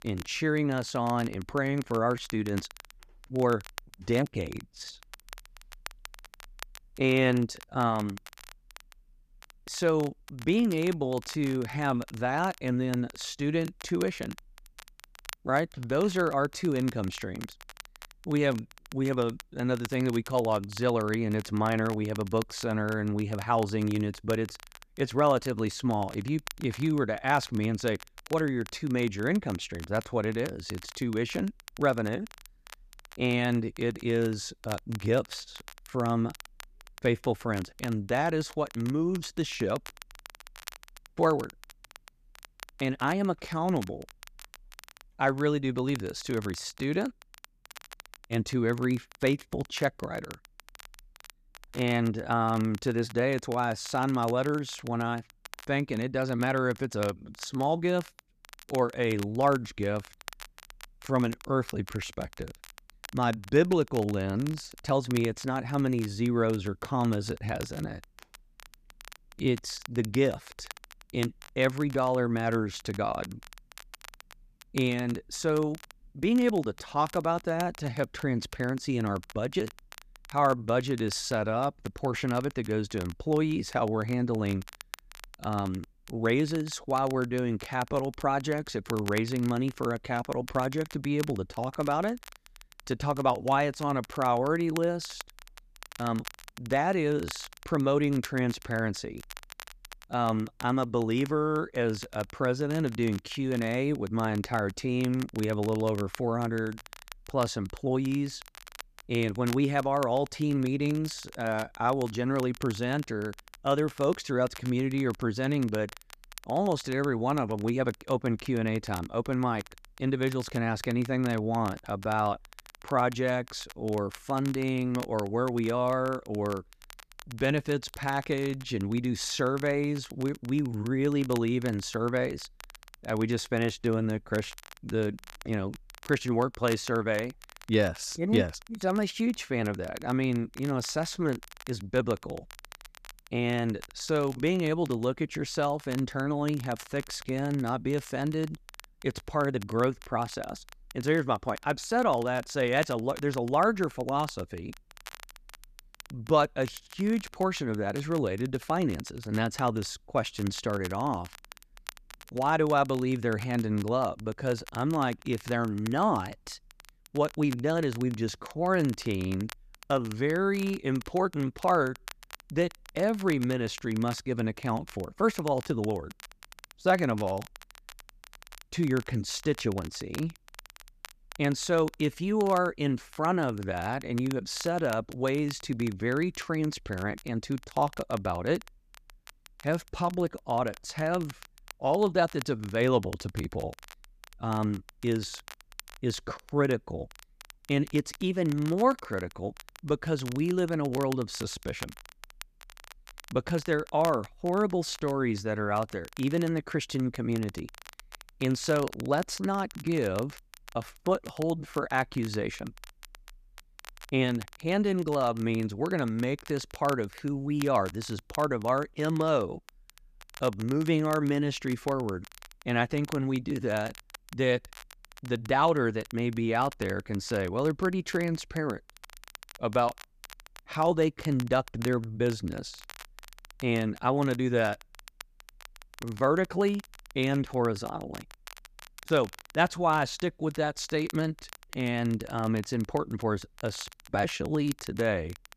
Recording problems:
crackle, like an old record; noticeable; 20 dB below the speech

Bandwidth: 14.5 kHz